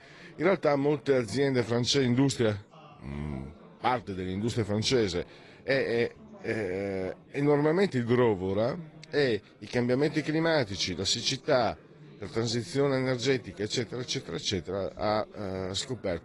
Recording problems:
garbled, watery; slightly
chatter from many people; faint; throughout; 25 dB below the speech

